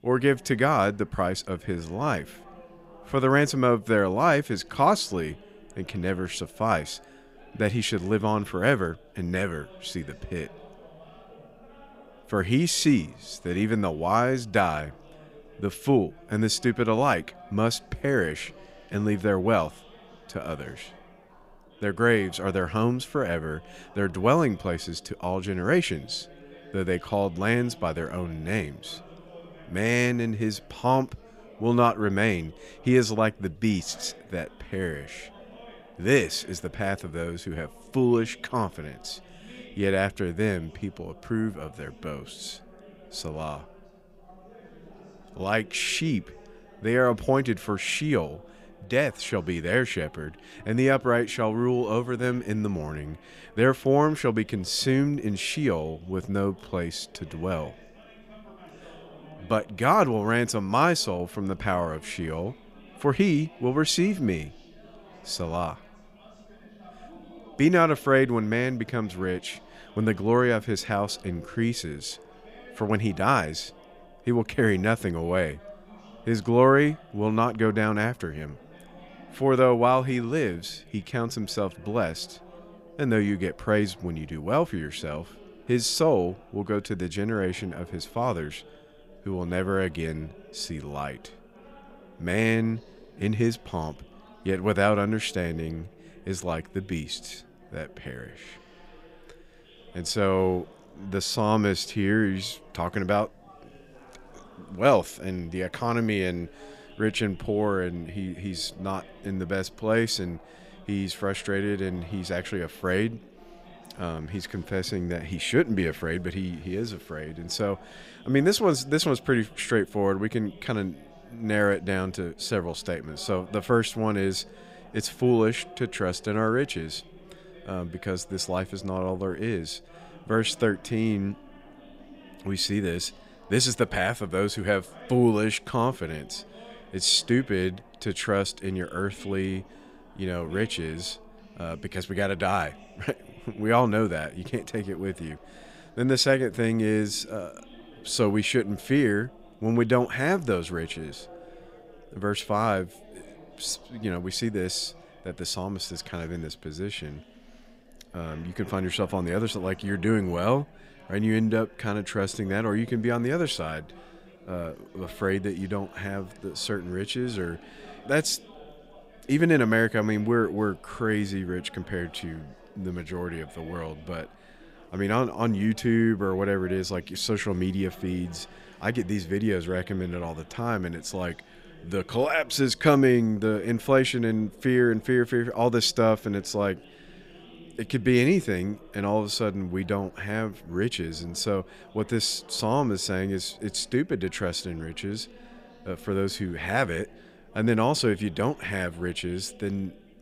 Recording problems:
chatter from many people; faint; throughout; 25 dB below the speech

